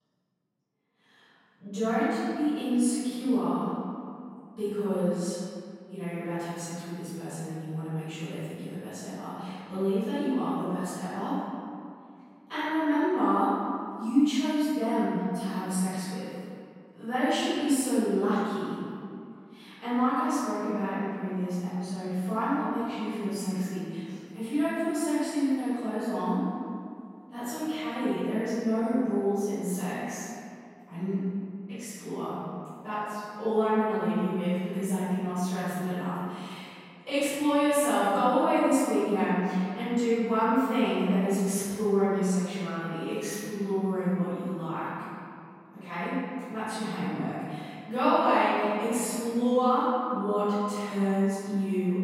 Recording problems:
room echo; strong; dies away in 2.1 s
off-mic speech; far

